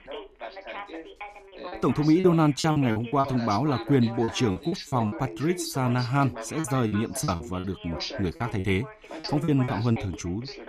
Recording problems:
background chatter; noticeable; throughout; 2 voices, 10 dB below the speech
choppy; very; from 2 to 3 s, at 4 s and from 6.5 to 10 s; 14% of the speech affected

